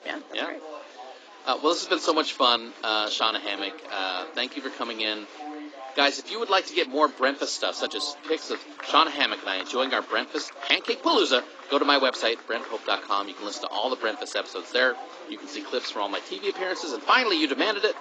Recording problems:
garbled, watery; badly; nothing above 7.5 kHz
thin; somewhat; fading below 300 Hz
chatter from many people; noticeable; throughout; 15 dB below the speech

